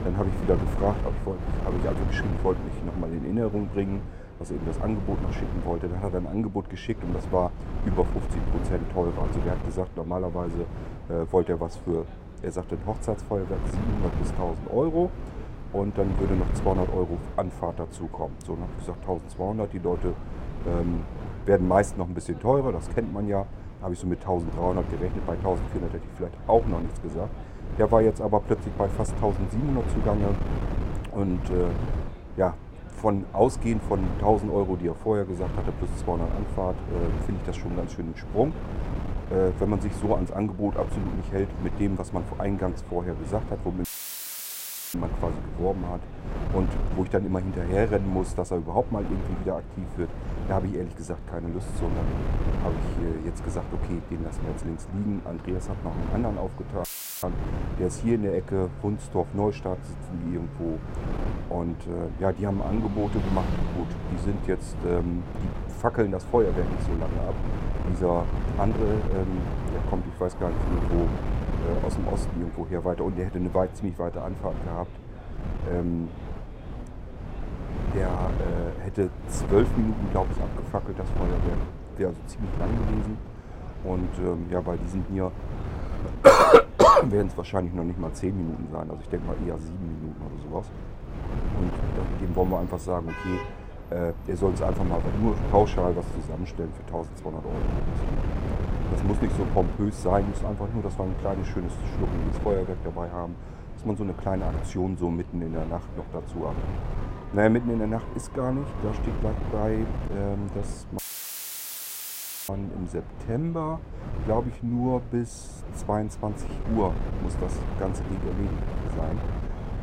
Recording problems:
muffled; slightly; fading above 1.5 kHz
traffic noise; noticeable; from 50 s on; 15 dB below the speech
wind noise on the microphone; occasional gusts; 10 dB below the speech
chatter from many people; faint; throughout; 25 dB below the speech
audio cutting out; filled with static; at 44 s for 1 s, at 57 s and at 1:51 for 1.5 s

